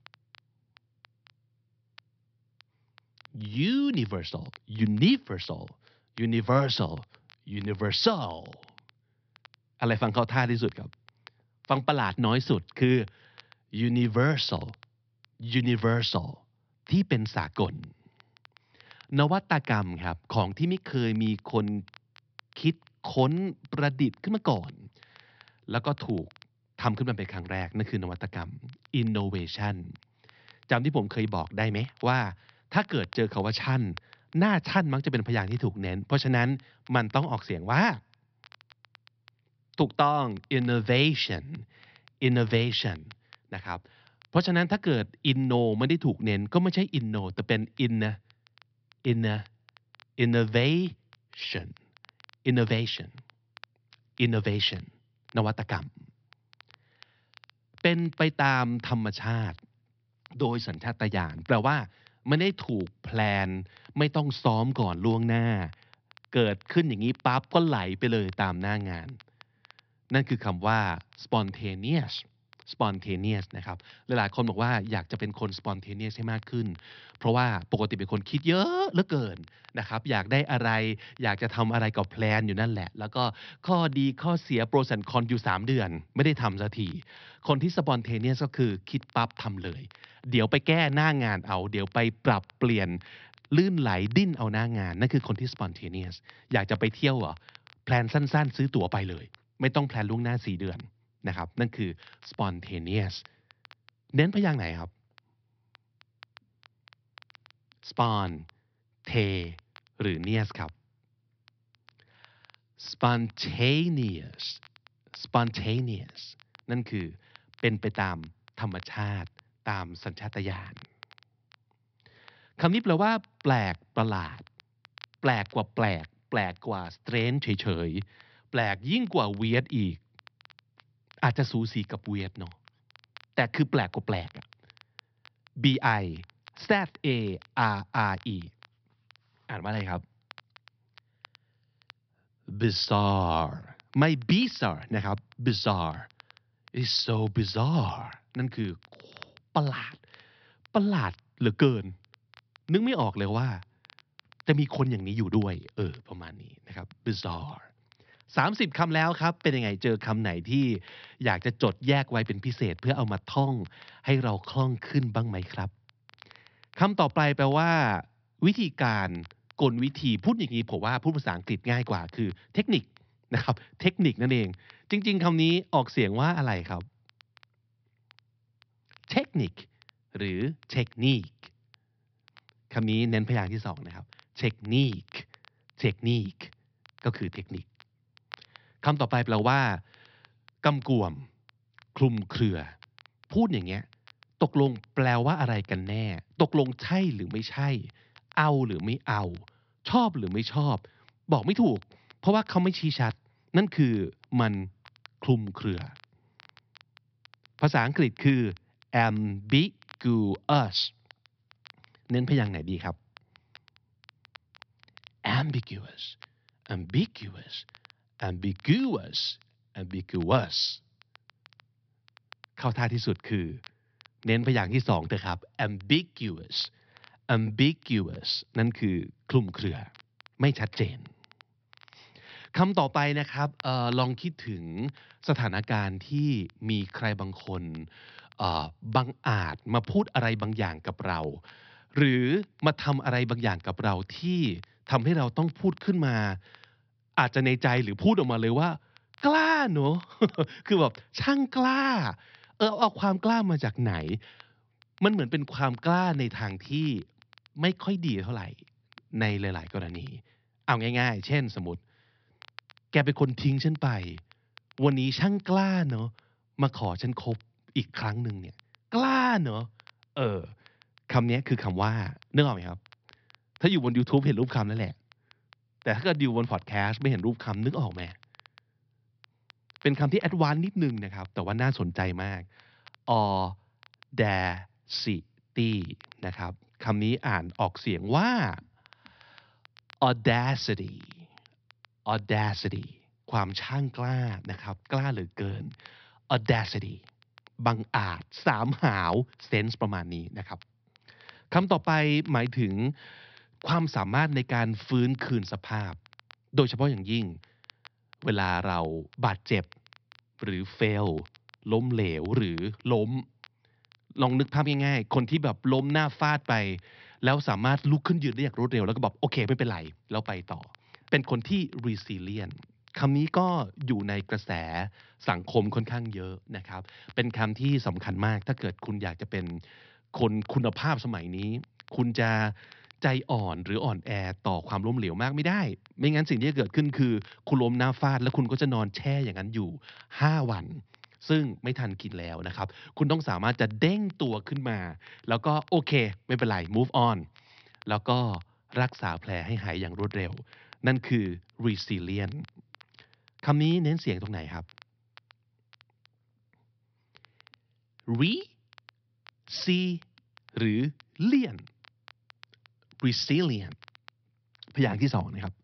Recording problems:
high frequencies cut off; noticeable; nothing above 5.5 kHz
crackle, like an old record; faint; 30 dB below the speech

